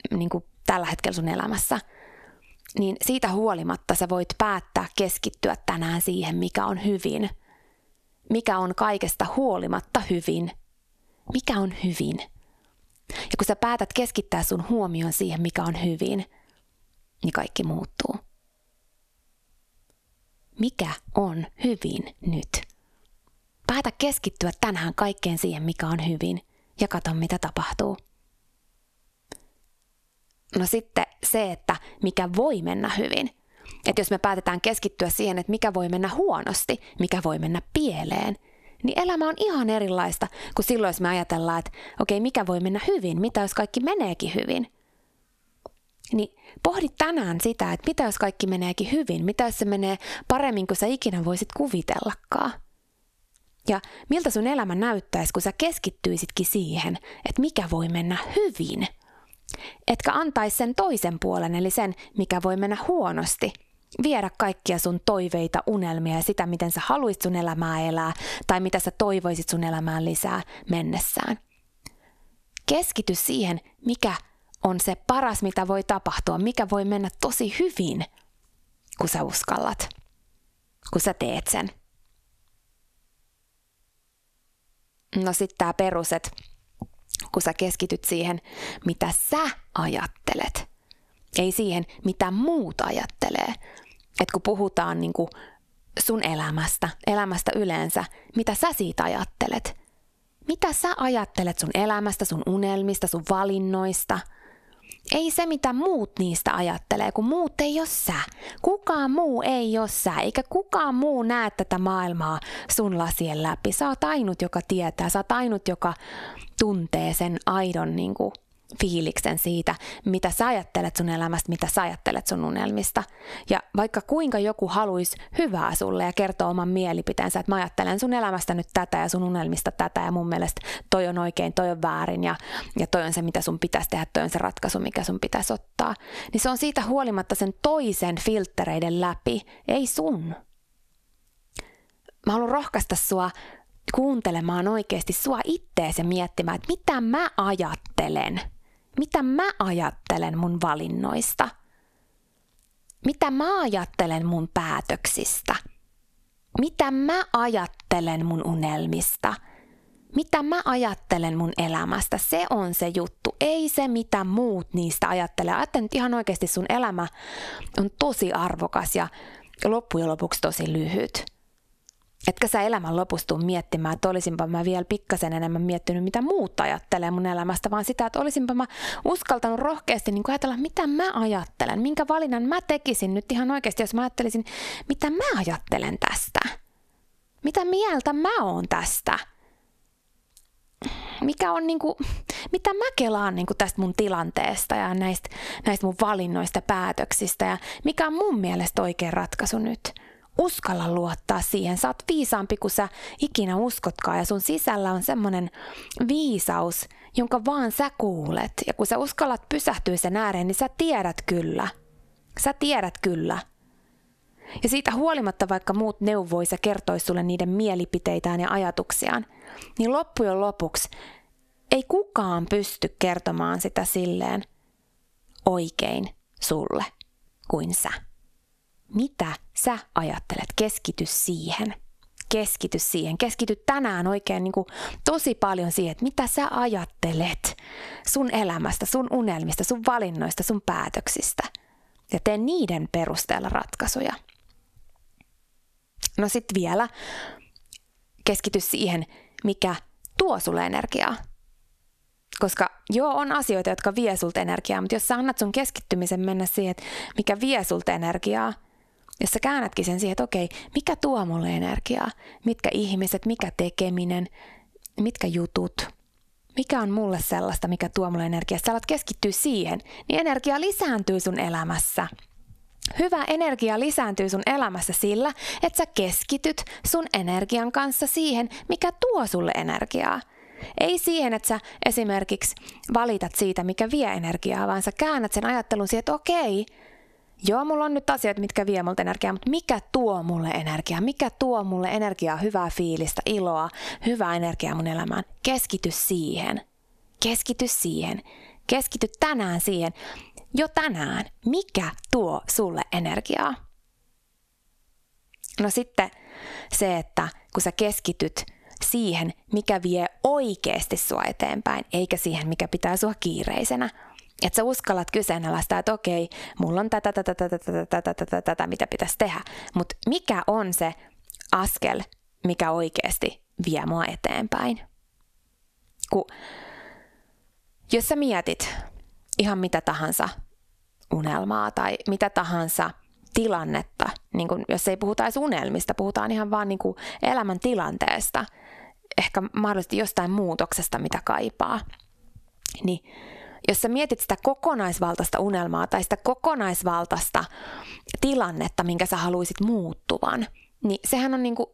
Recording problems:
squashed, flat; heavily

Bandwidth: 14 kHz